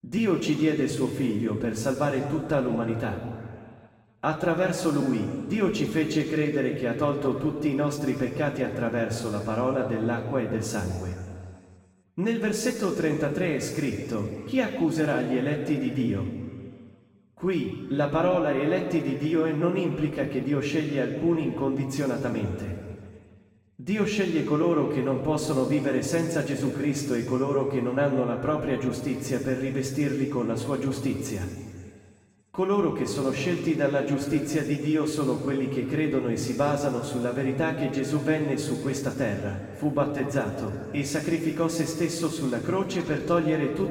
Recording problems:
off-mic speech; far
room echo; noticeable; dies away in 2 s

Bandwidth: 16 kHz